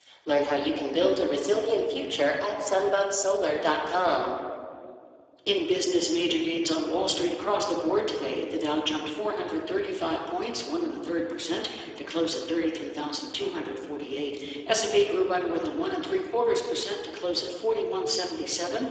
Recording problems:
garbled, watery; badly; nothing above 7.5 kHz
room echo; noticeable; dies away in 1.5 s
thin; somewhat; fading below 300 Hz
off-mic speech; somewhat distant

